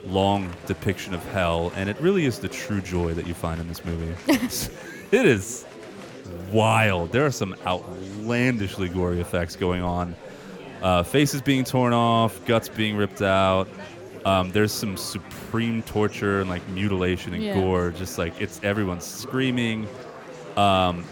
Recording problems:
chatter from many people; noticeable; throughout; 15 dB below the speech

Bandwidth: 18 kHz